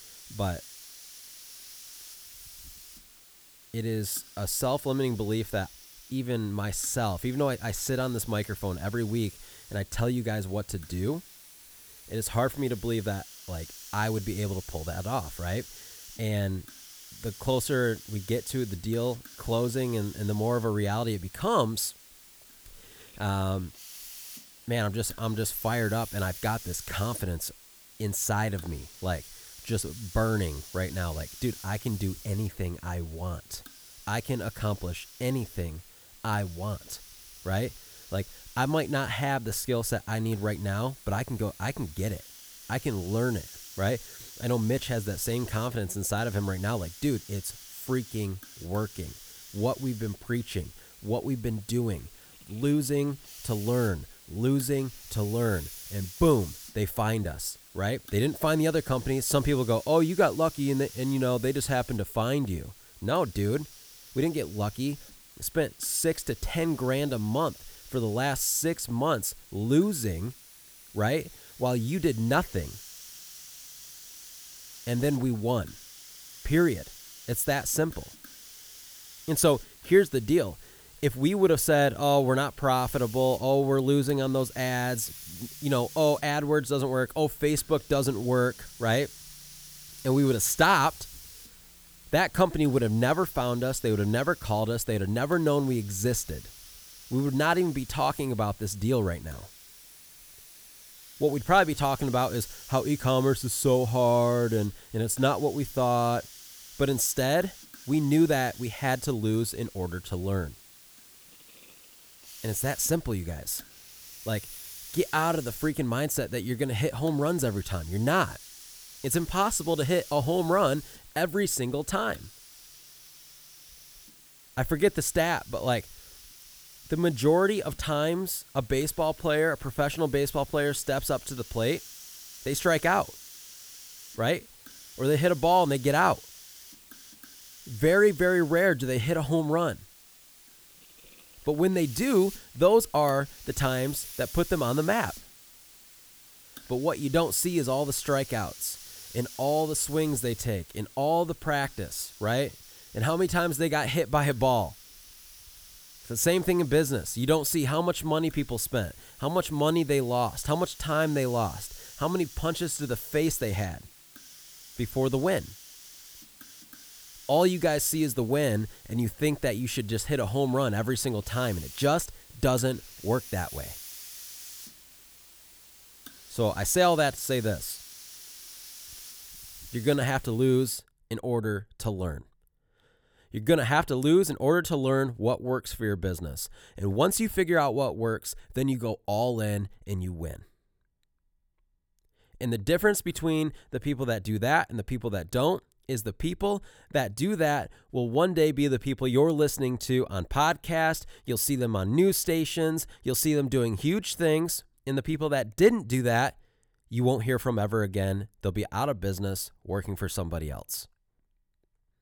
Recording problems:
hiss; noticeable; until 3:01; 20 dB below the speech

